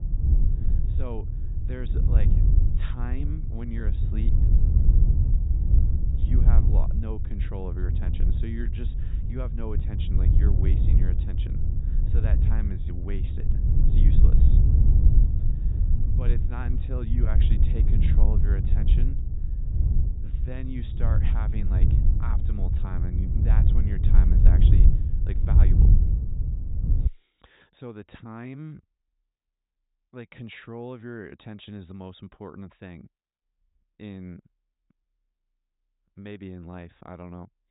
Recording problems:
high frequencies cut off; severe; nothing above 4 kHz
wind noise on the microphone; heavy; until 27 s; 1 dB above the speech

